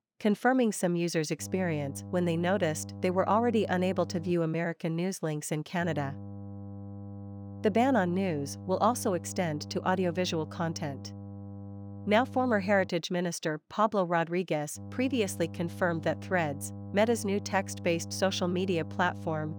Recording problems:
electrical hum; faint; from 1.5 to 4.5 s, from 6 to 13 s and from 15 s on; 50 Hz, 20 dB below the speech

